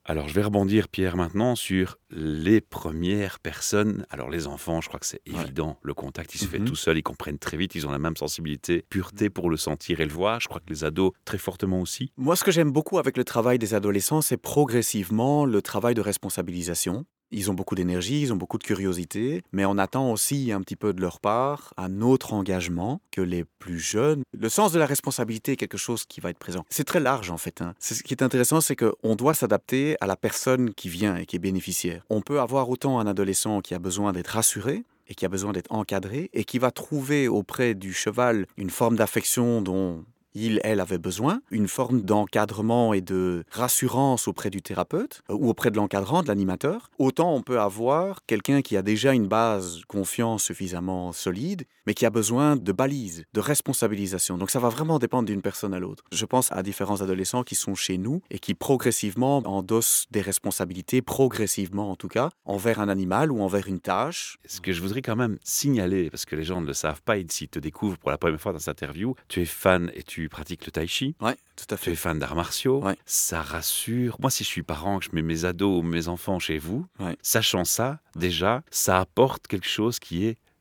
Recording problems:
none

